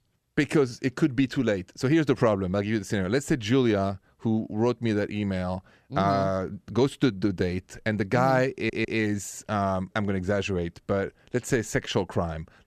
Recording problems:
audio stuttering; at 8.5 s

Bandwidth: 14.5 kHz